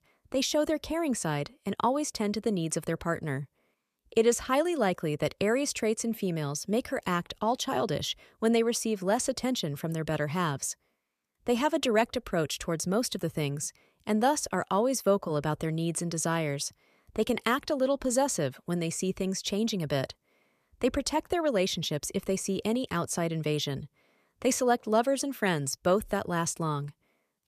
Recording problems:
none

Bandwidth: 14.5 kHz